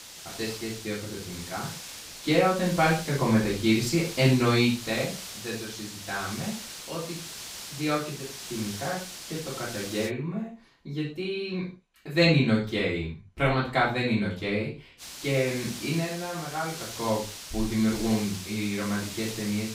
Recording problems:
off-mic speech; far
room echo; noticeable; dies away in 0.3 s
hiss; noticeable; until 10 s and from 15 s on; 10 dB below the speech

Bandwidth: 15.5 kHz